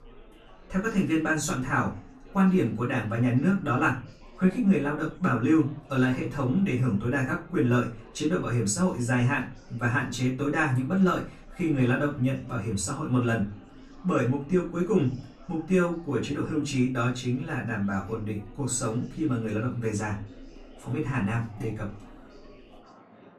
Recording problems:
off-mic speech; far
room echo; slight; dies away in 0.3 s
chatter from many people; faint; throughout; 25 dB below the speech

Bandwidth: 13.5 kHz